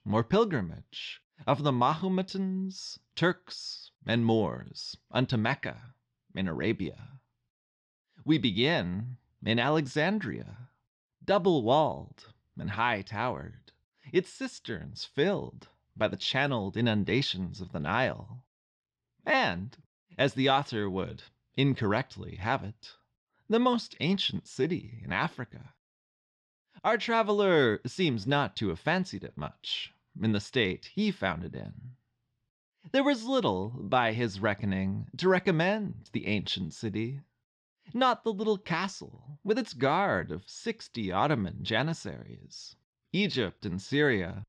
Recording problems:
muffled; very; fading above 3.5 kHz

